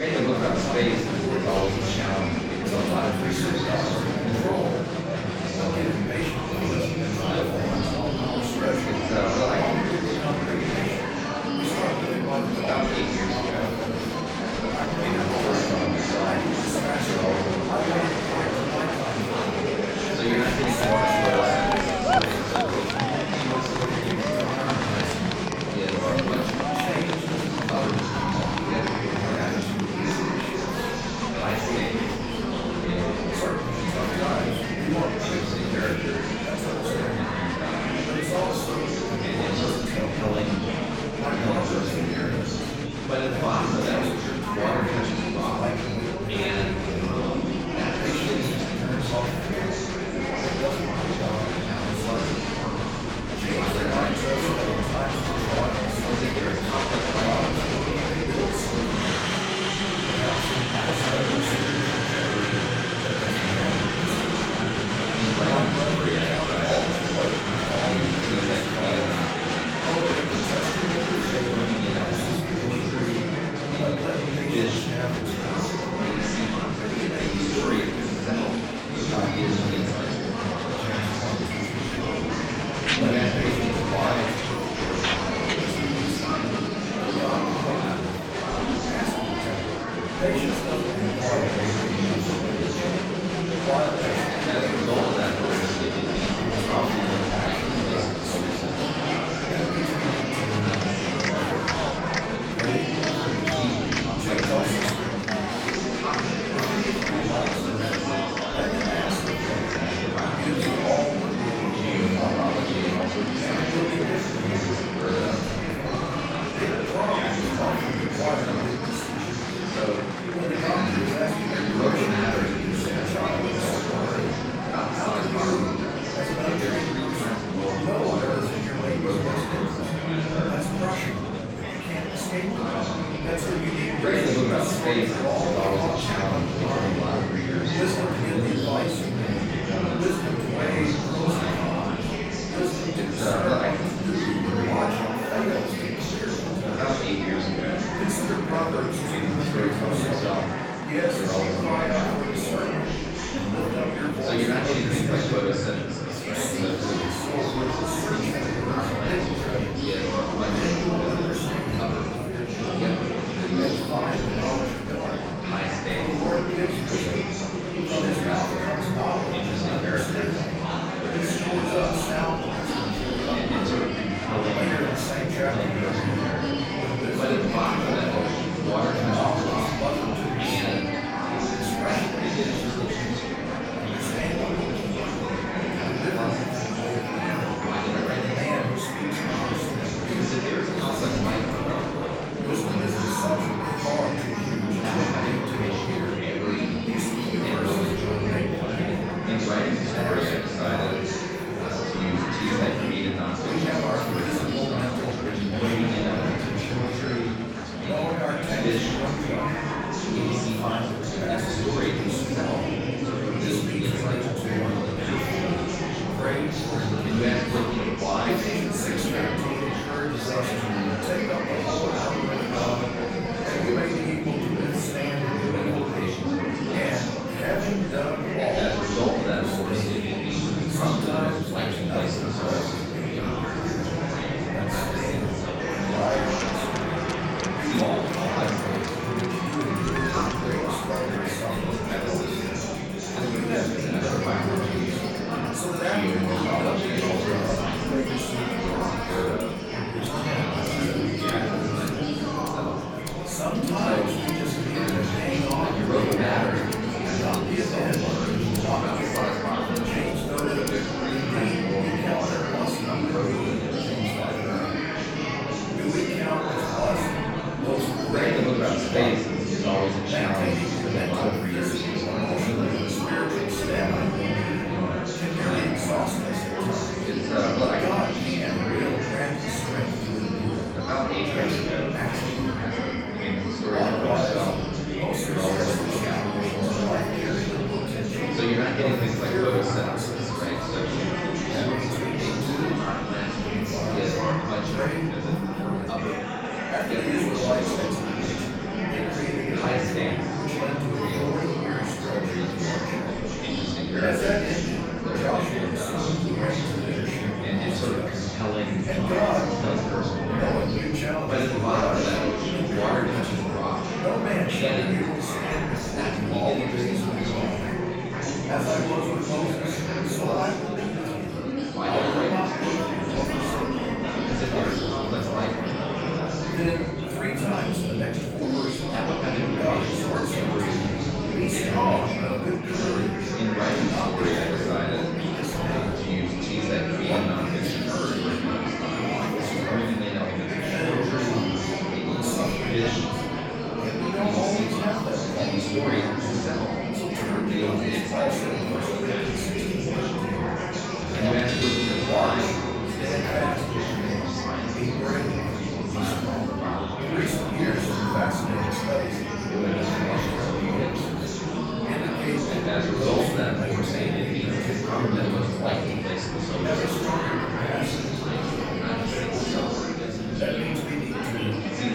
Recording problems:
off-mic speech; far
room echo; noticeable; dies away in 0.7 s
murmuring crowd; very loud; throughout; 4 dB above the speech
background music; noticeable; throughout; 15 dB below the speech

